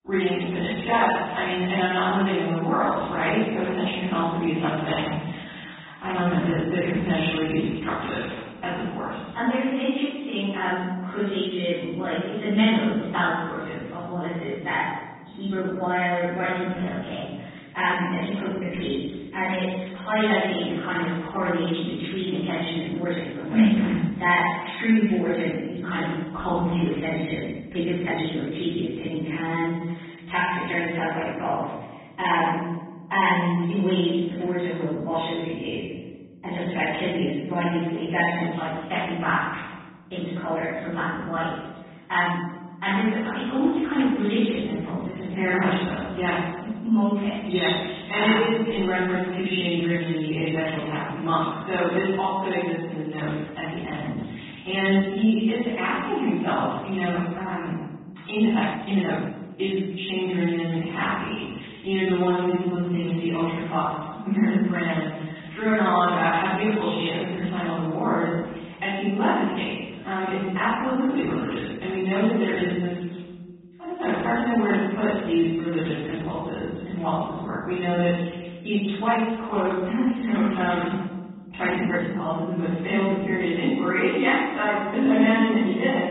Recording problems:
room echo; strong; dies away in 1.2 s
off-mic speech; far
high frequencies cut off; severe; nothing above 4 kHz
garbled, watery; slightly
uneven, jittery; strongly; from 1.5 s to 1:22

